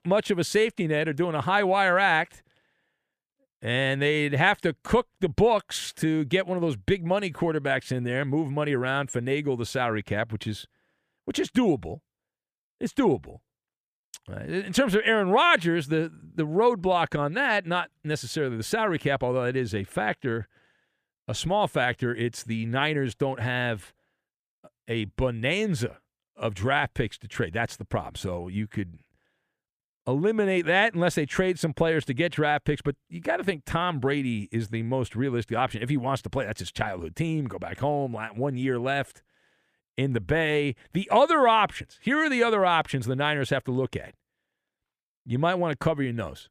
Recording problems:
none

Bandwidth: 14.5 kHz